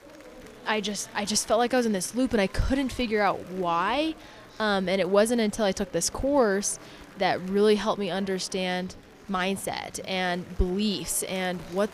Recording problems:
murmuring crowd; faint; throughout; 20 dB below the speech

